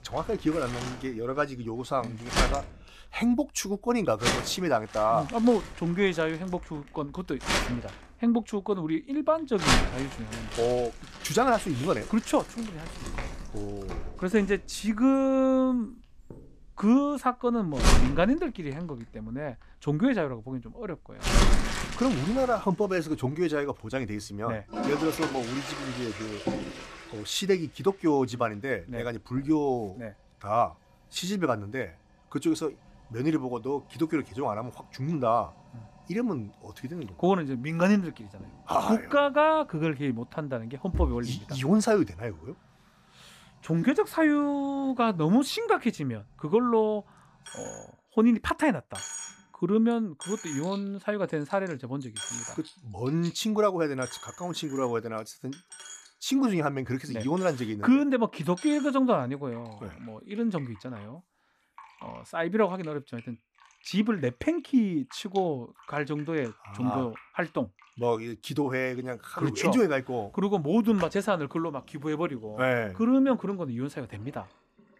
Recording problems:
household noises; loud; throughout; 6 dB below the speech

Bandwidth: 14.5 kHz